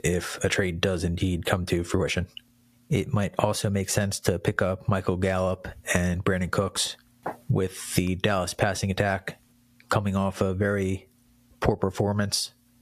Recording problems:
squashed, flat; somewhat

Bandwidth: 14.5 kHz